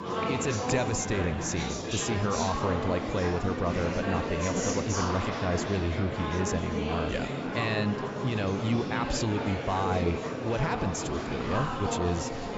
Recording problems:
high frequencies cut off; noticeable; nothing above 8 kHz
murmuring crowd; loud; throughout; 1 dB below the speech

